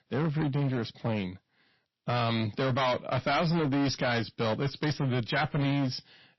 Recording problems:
distortion; heavy; 18% of the sound clipped
garbled, watery; slightly; nothing above 5.5 kHz

